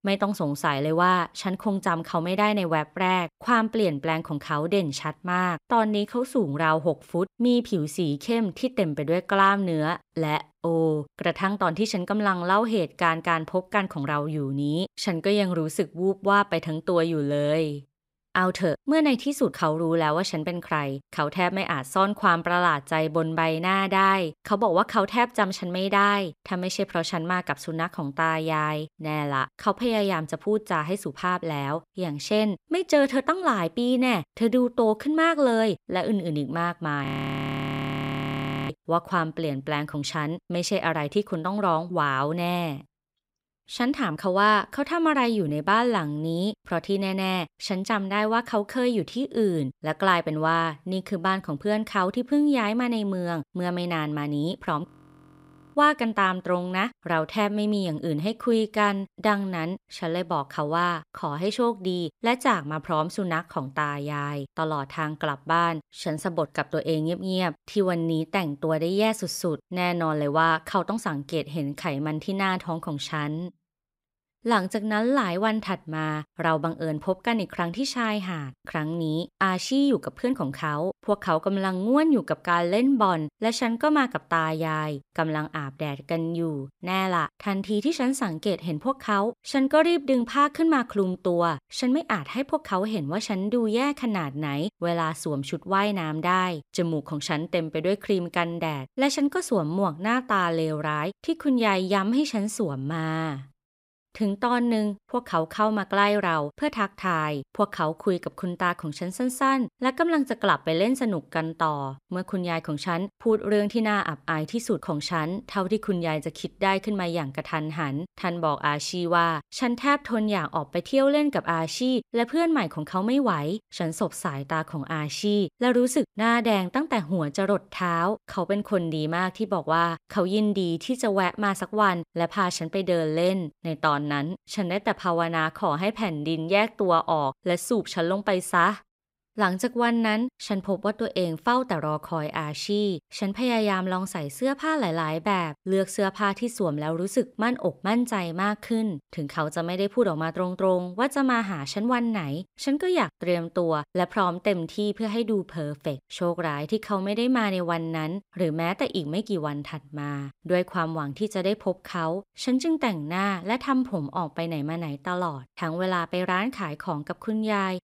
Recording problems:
audio freezing; at 37 s for 1.5 s and at 55 s for 1 s

